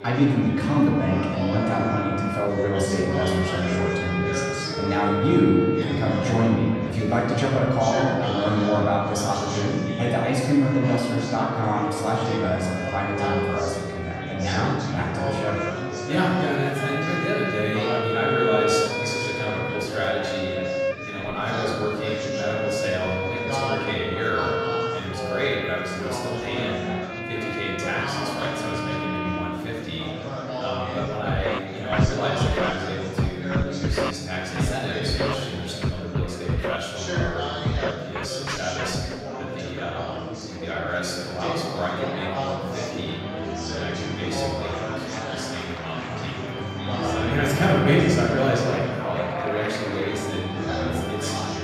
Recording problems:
off-mic speech; far
room echo; noticeable; dies away in 1.6 s
background music; loud; throughout; 4 dB below the speech
chatter from many people; loud; throughout; 6 dB below the speech

